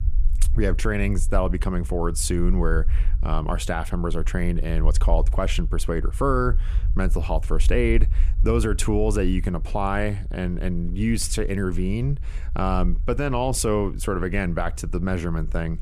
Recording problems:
low rumble; faint; throughout; 20 dB below the speech

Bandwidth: 14.5 kHz